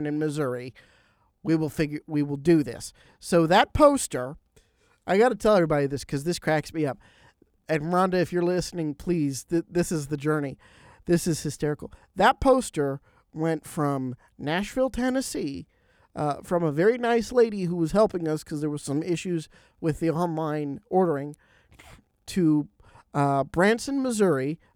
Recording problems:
abrupt cut into speech; at the start

